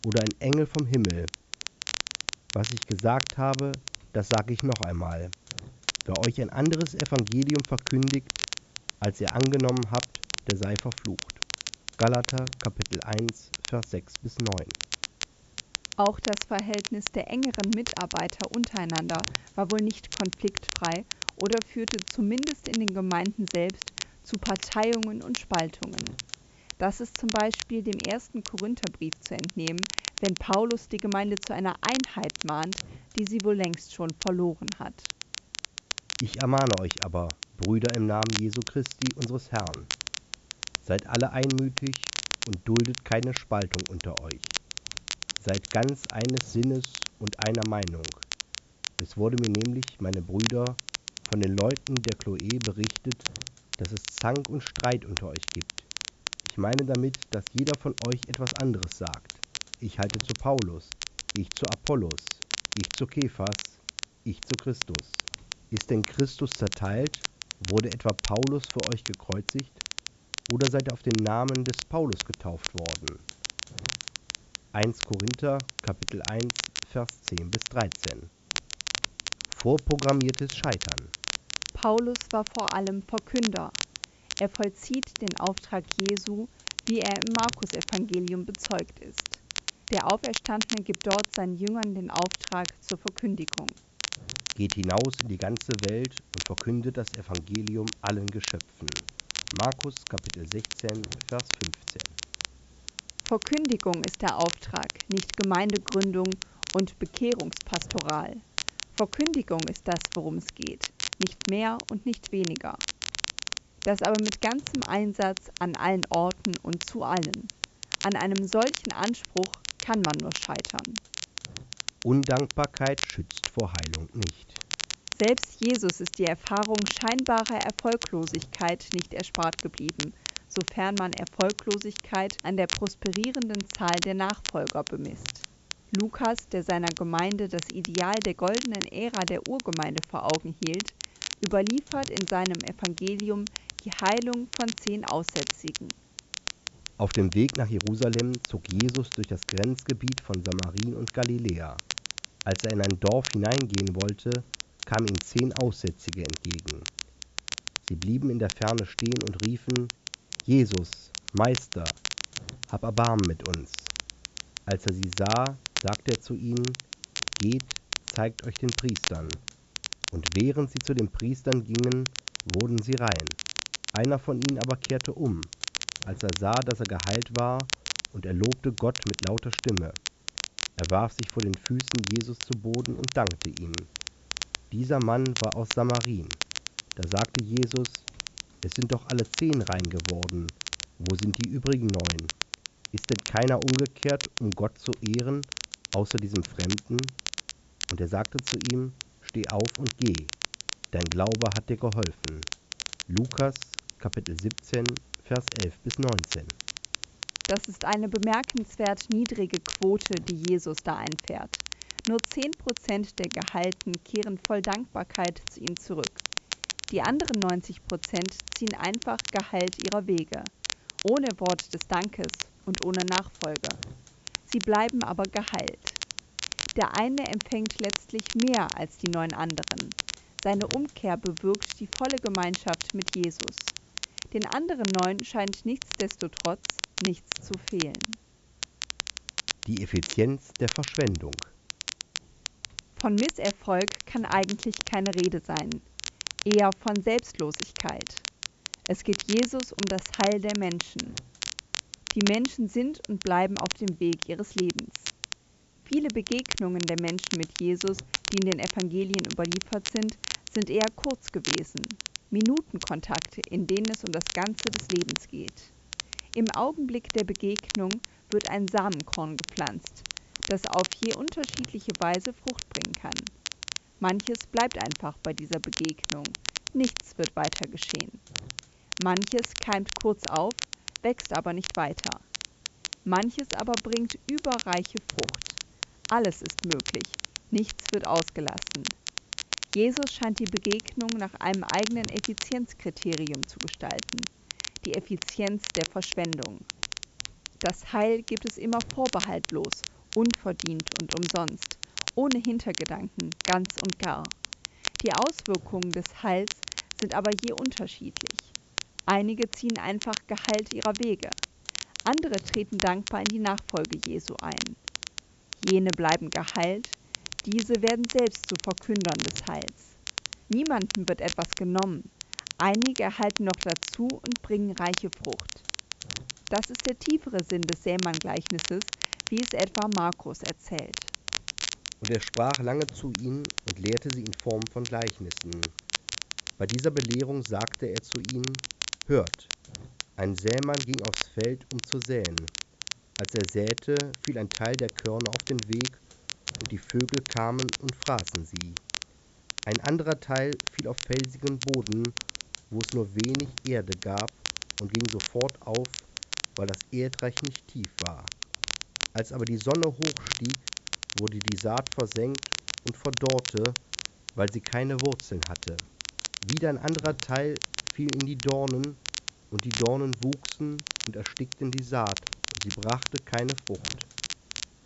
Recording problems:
high frequencies cut off; noticeable; nothing above 8 kHz
crackle, like an old record; loud; 5 dB below the speech
hiss; faint; throughout; 25 dB below the speech

